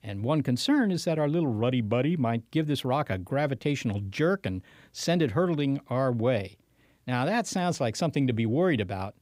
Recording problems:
none

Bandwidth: 15.5 kHz